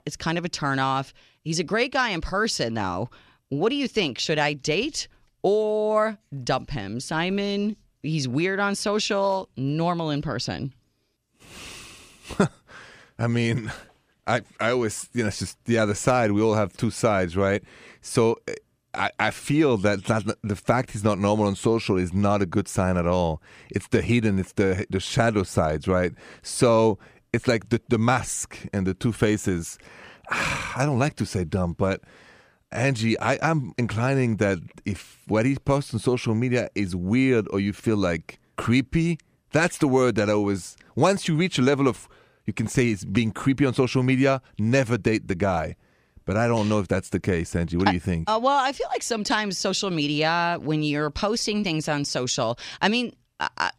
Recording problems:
none

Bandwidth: 15 kHz